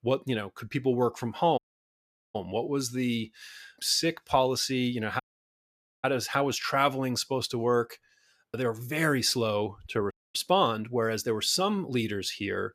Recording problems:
audio cutting out; at 1.5 s for 1 s, at 5 s for 1 s and at 10 s

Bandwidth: 14.5 kHz